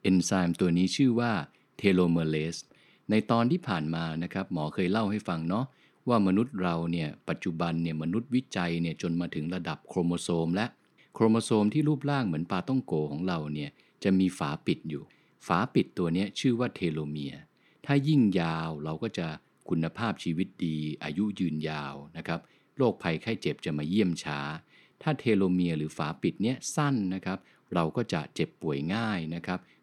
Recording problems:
none

